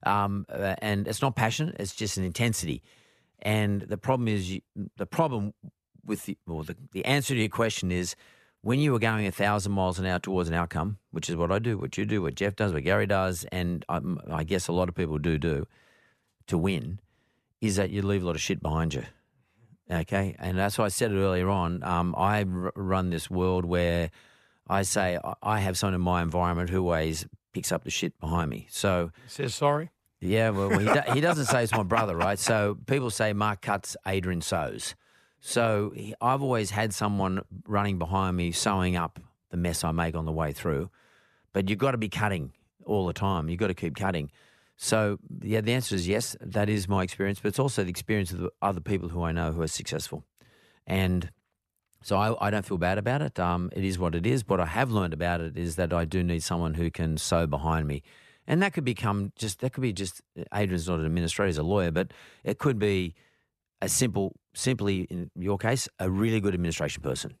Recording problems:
none

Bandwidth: 14 kHz